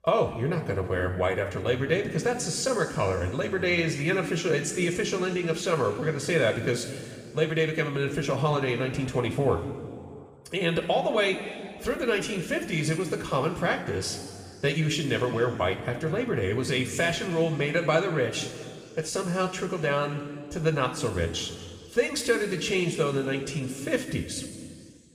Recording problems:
room echo; noticeable; dies away in 1.9 s
off-mic speech; somewhat distant

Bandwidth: 15 kHz